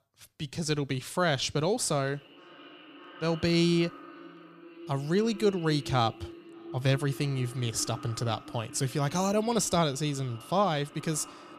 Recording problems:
echo of what is said; noticeable; throughout; 580 ms later, 15 dB below the speech

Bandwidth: 15 kHz